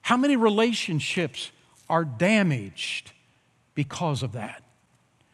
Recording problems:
none

